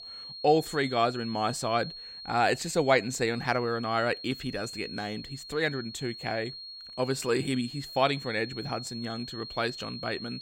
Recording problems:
high-pitched whine; noticeable; throughout; 4.5 kHz, 10 dB below the speech

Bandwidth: 16 kHz